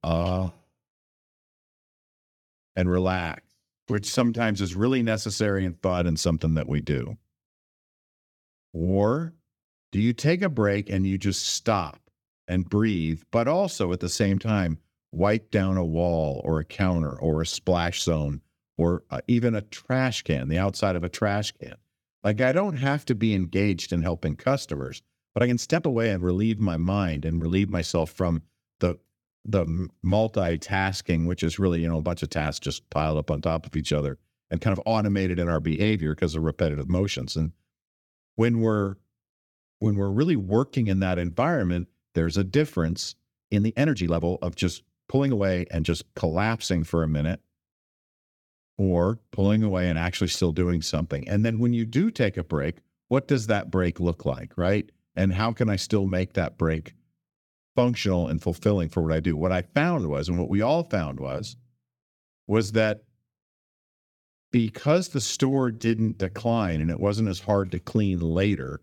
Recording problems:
uneven, jittery; strongly; from 3.5 s to 1:06

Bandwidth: 17.5 kHz